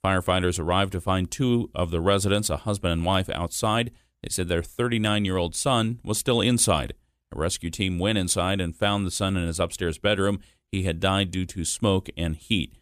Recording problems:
none

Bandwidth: 14.5 kHz